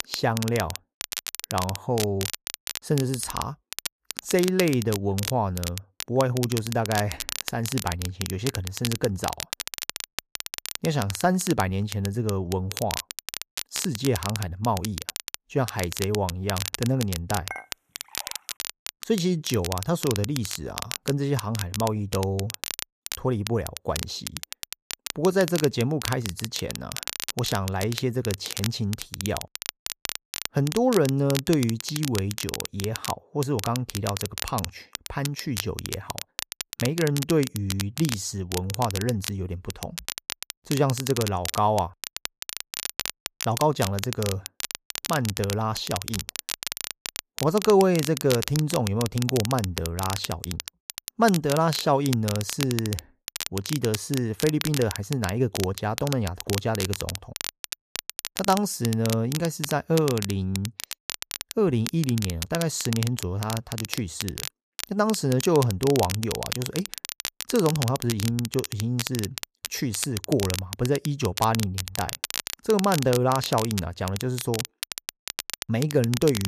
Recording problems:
crackle, like an old record; loud; 7 dB below the speech
clattering dishes; faint; at 18 s; peak 10 dB below the speech
abrupt cut into speech; at the end

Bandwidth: 14.5 kHz